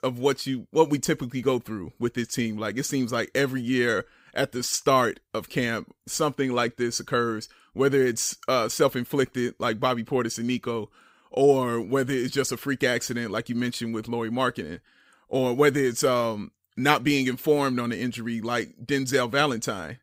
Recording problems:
none

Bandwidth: 15.5 kHz